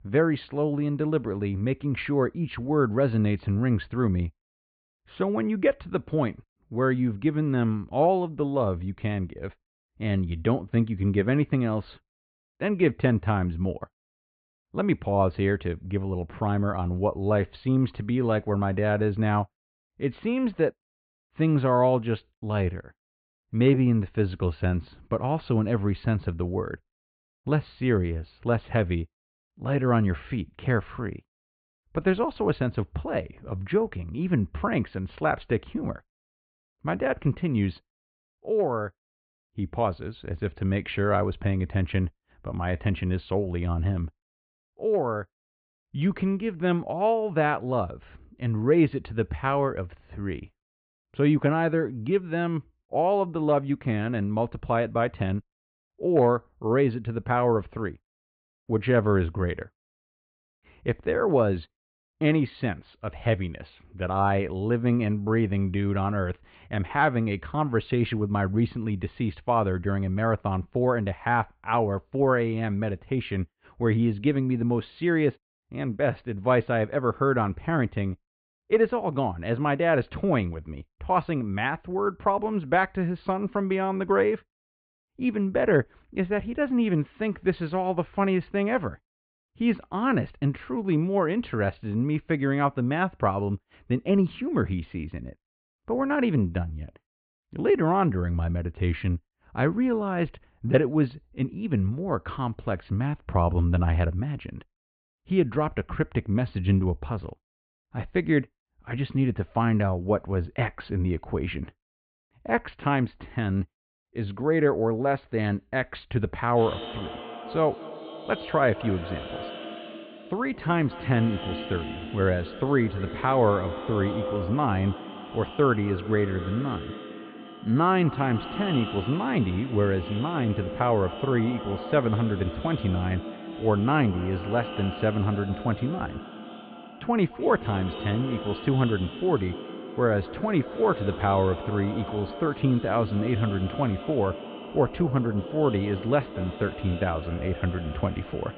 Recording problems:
echo of what is said; strong; from 1:57 on; 210 ms later, 10 dB below the speech
high frequencies cut off; severe; nothing above 4.5 kHz
muffled; very slightly; fading above 3 kHz

